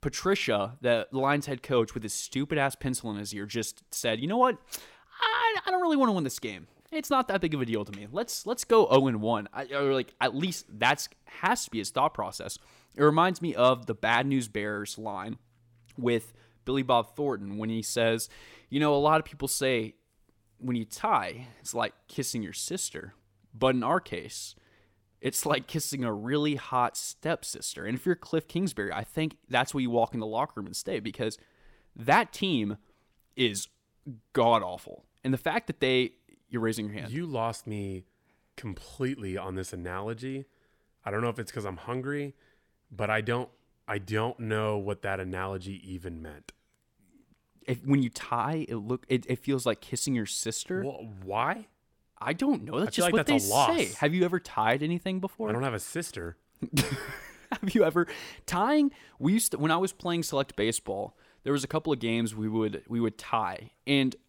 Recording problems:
none

